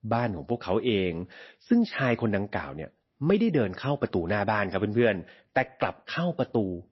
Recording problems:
garbled, watery; slightly; nothing above 5.5 kHz

